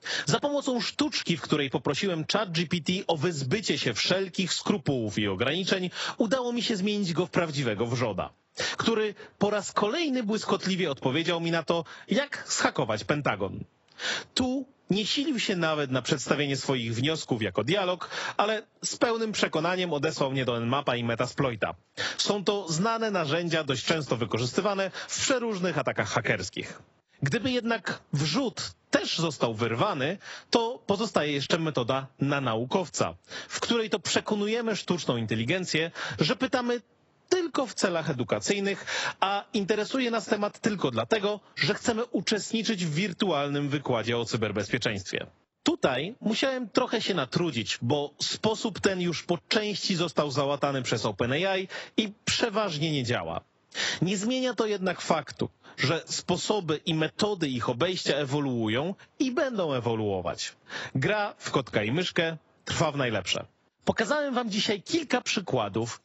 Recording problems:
garbled, watery; badly; nothing above 8 kHz
squashed, flat; somewhat

